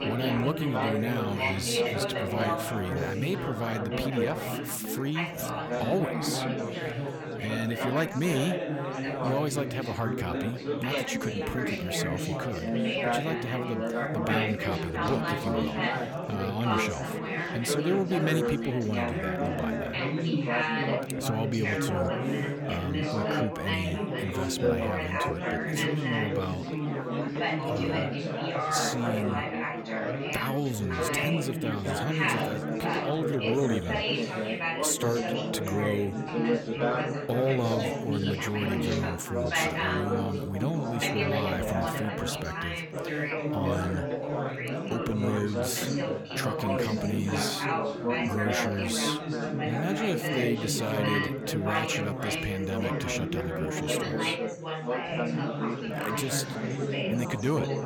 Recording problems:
chatter from many people; very loud; throughout; 2 dB above the speech

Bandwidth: 18 kHz